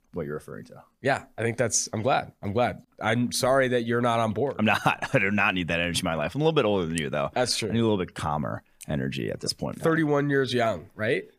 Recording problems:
none

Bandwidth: 15 kHz